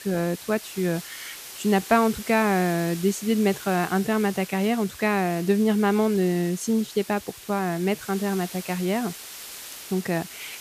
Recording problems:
hiss; noticeable; throughout; 15 dB below the speech

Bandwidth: 14.5 kHz